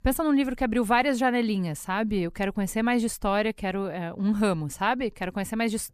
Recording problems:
none

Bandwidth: 14.5 kHz